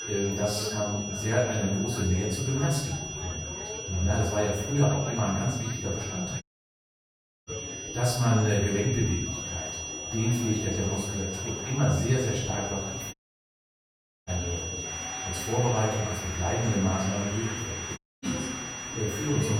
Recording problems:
off-mic speech; far
room echo; noticeable; dies away in 0.8 s
high-pitched whine; loud; throughout; 6 kHz, 6 dB below the speech
chatter from many people; noticeable; throughout; 10 dB below the speech
audio cutting out; at 6.5 s for 1 s, at 13 s for 1 s and at 18 s
abrupt cut into speech; at the end

